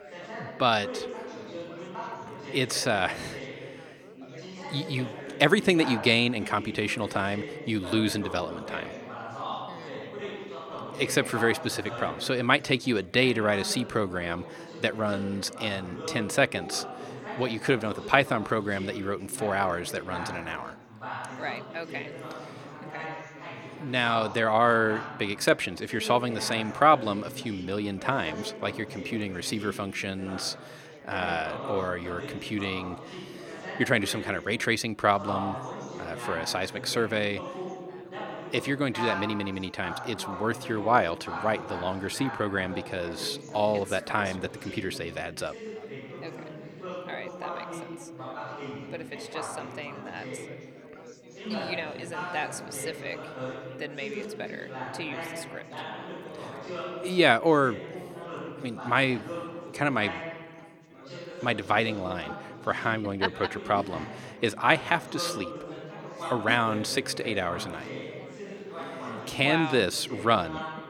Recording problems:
chatter from many people; noticeable; throughout; 10 dB below the speech

